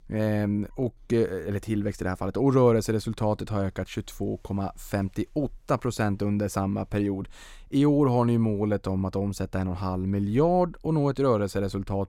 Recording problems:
none

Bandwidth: 16 kHz